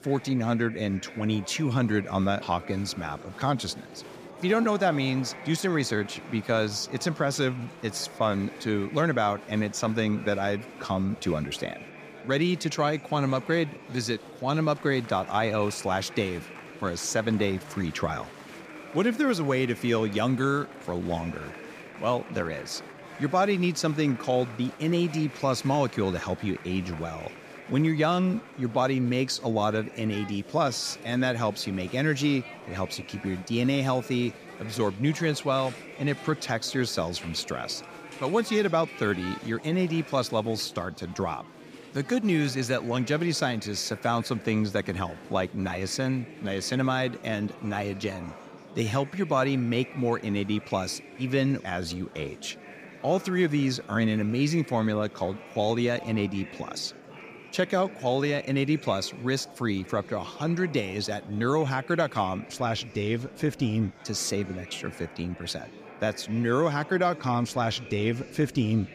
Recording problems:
murmuring crowd; noticeable; throughout; 15 dB below the speech

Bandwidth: 15 kHz